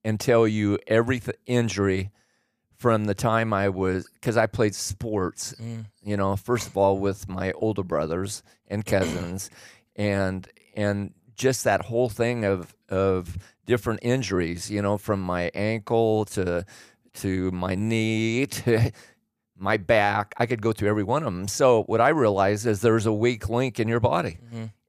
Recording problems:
none

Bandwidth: 15 kHz